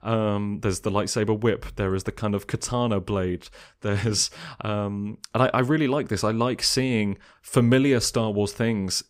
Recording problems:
none

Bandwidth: 15.5 kHz